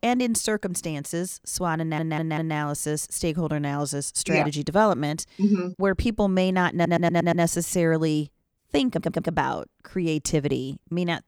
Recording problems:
audio stuttering; at 2 s, at 6.5 s and at 9 s

